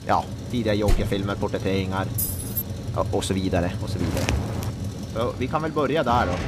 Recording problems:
traffic noise; loud; throughout; 6 dB below the speech
door banging; noticeable; at 1 s; peak 4 dB below the speech
jangling keys; noticeable; at 2 s; peak 1 dB below the speech
footsteps; noticeable; at 4 s; peak level with the speech

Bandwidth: 14.5 kHz